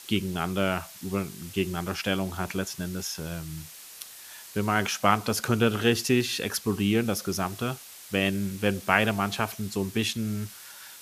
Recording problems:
hiss; noticeable; throughout; 15 dB below the speech

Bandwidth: 14.5 kHz